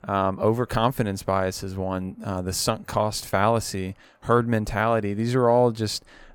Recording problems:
none

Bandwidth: 17.5 kHz